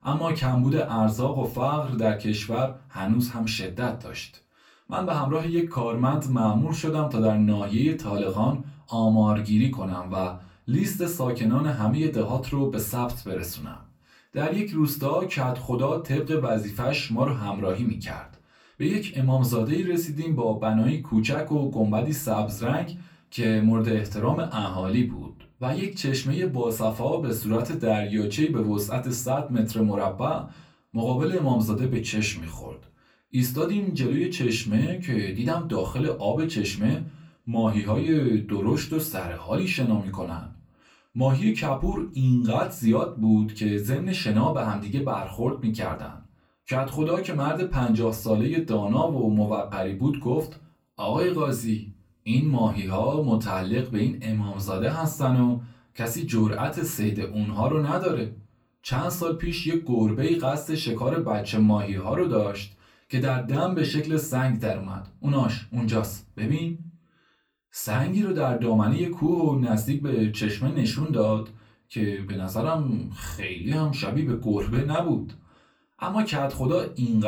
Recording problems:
off-mic speech; far
room echo; very slight; dies away in 0.3 s
abrupt cut into speech; at the end

